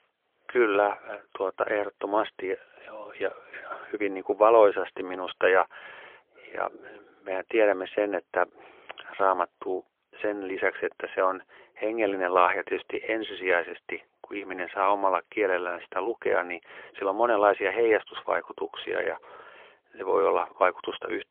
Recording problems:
phone-call audio; poor line; nothing above 3.5 kHz

